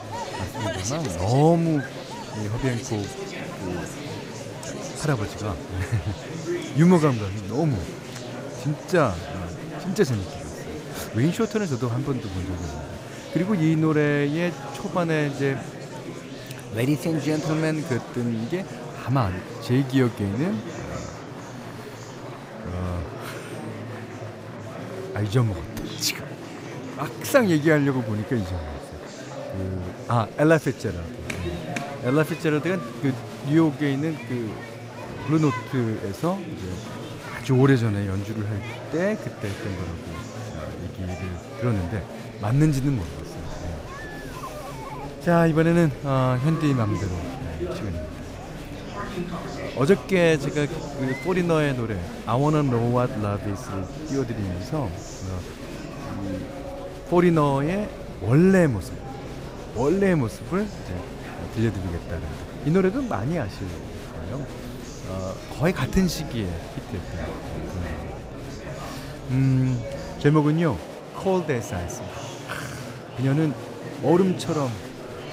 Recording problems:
murmuring crowd; noticeable; throughout; 10 dB below the speech

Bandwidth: 15.5 kHz